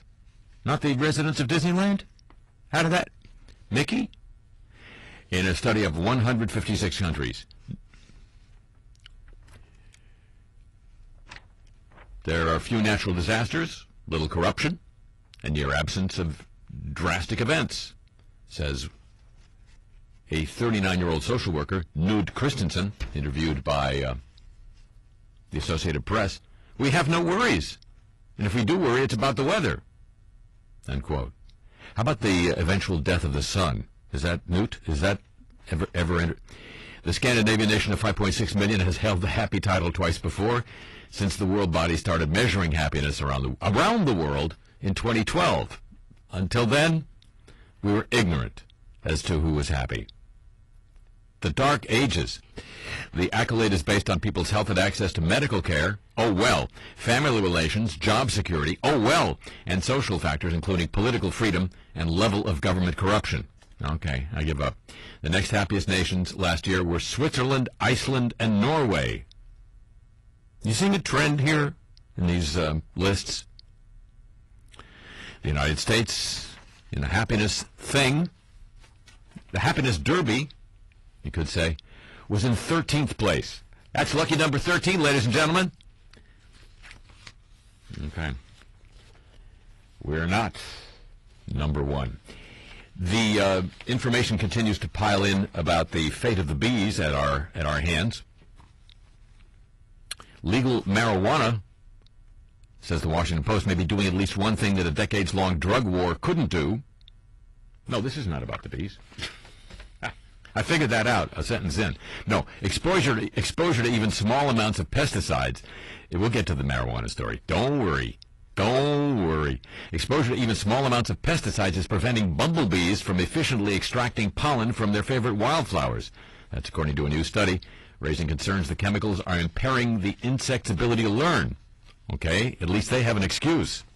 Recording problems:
distortion; heavy; 7 dB below the speech
garbled, watery; slightly; nothing above 11.5 kHz

